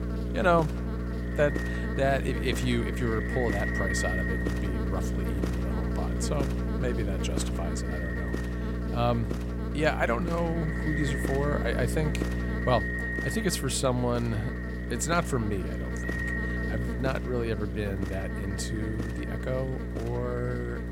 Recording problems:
echo of what is said; strong; throughout; 270 ms later, 8 dB below the speech
electrical hum; loud; throughout; 60 Hz, 7 dB below the speech

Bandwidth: 16 kHz